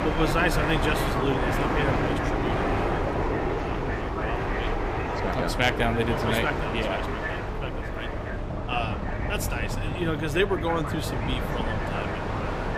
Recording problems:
train or aircraft noise; very loud; throughout; 1 dB above the speech
background chatter; noticeable; throughout; 2 voices, 10 dB below the speech
electrical hum; faint; throughout; 50 Hz, 25 dB below the speech

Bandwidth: 15 kHz